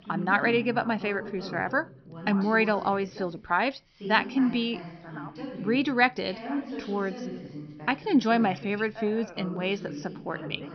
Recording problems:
high frequencies cut off; noticeable; nothing above 6 kHz
background chatter; noticeable; throughout; 2 voices, 10 dB below the speech

